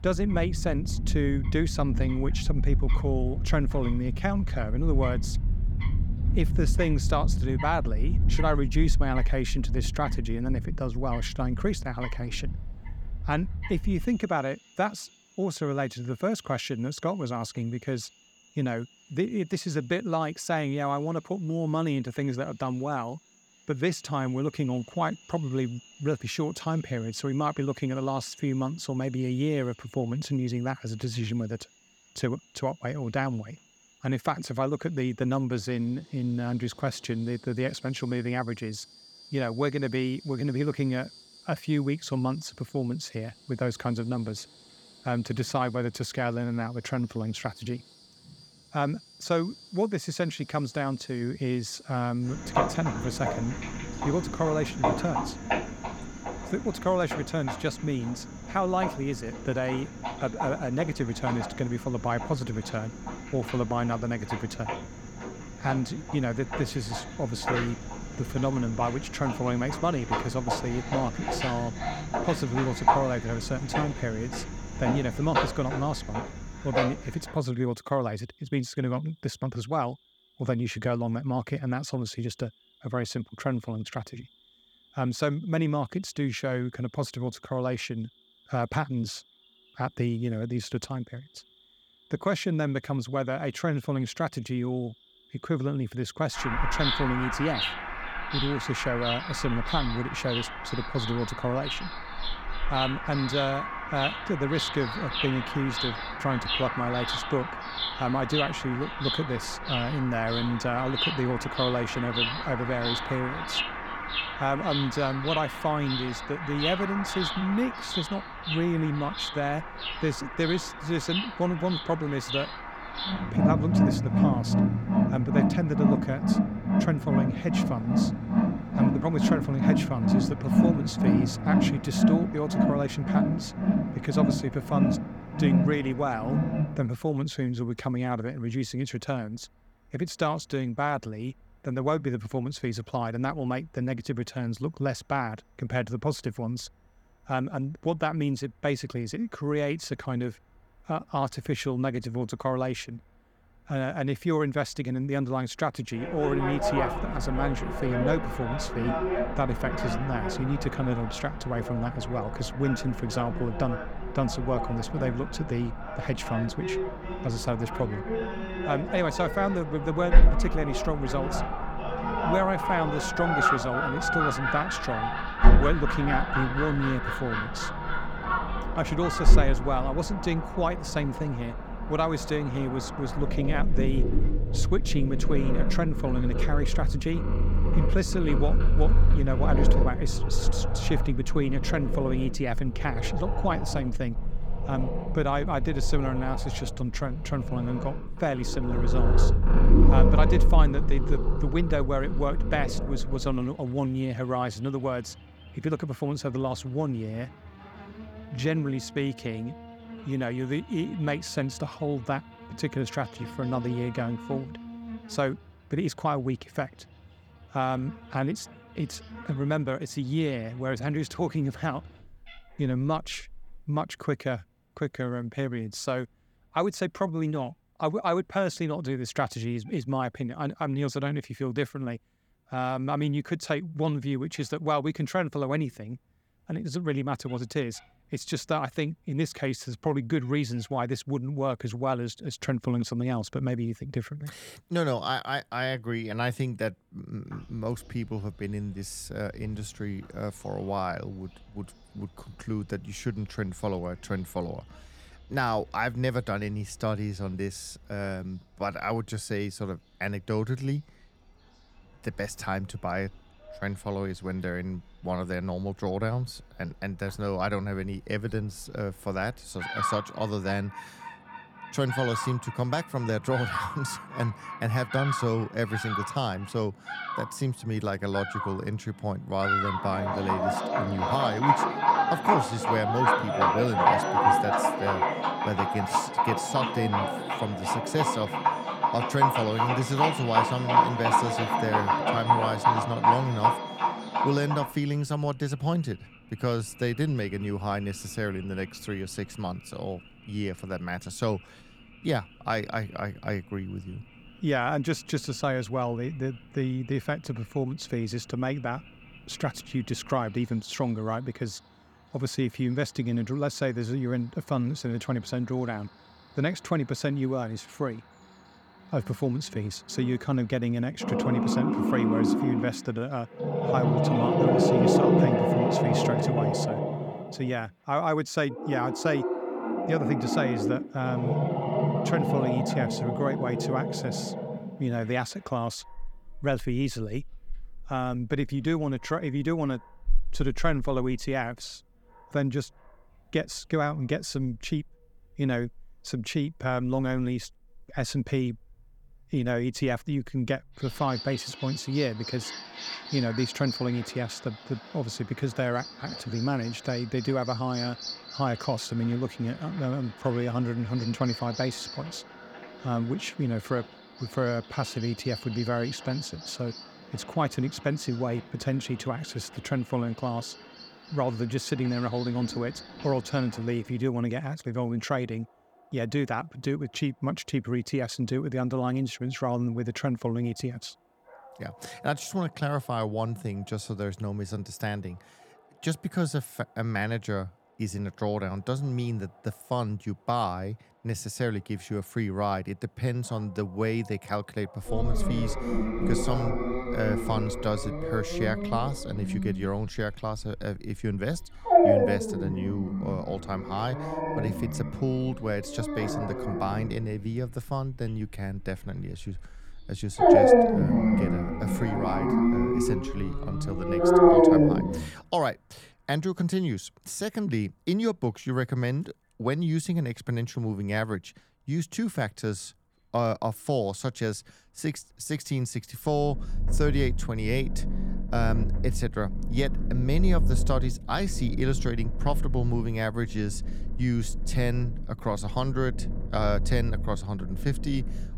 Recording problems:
animal sounds; very loud; throughout; 1 dB above the speech

